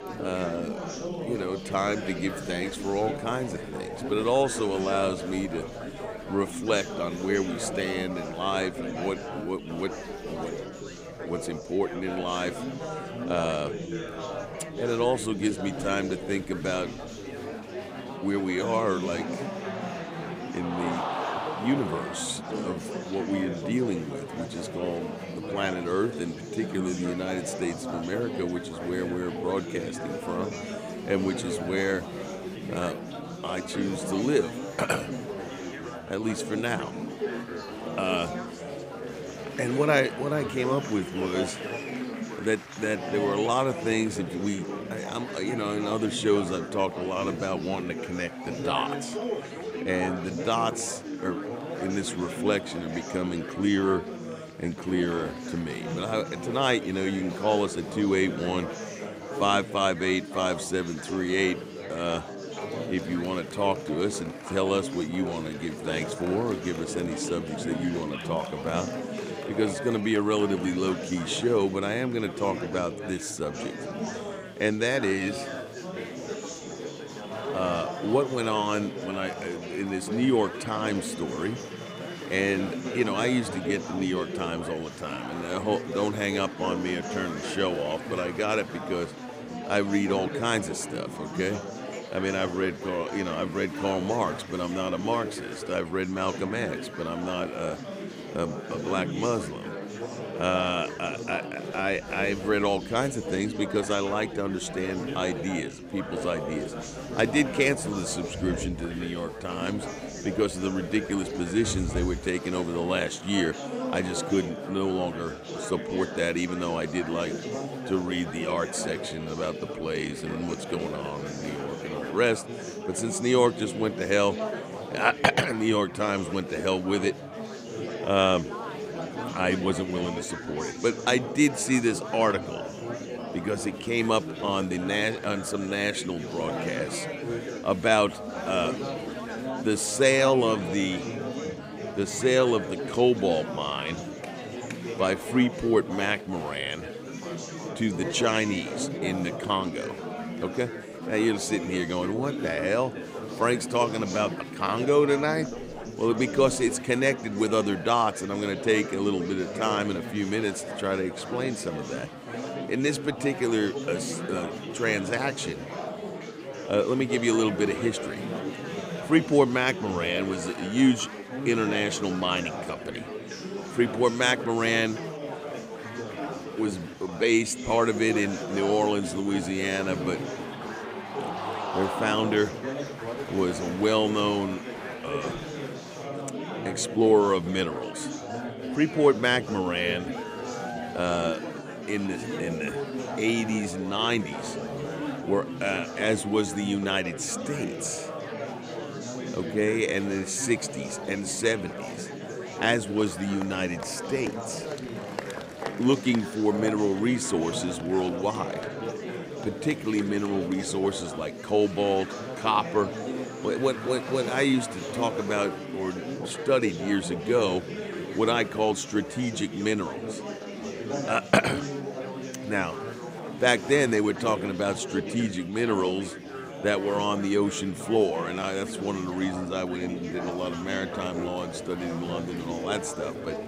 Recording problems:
chatter from many people; loud; throughout; 7 dB below the speech

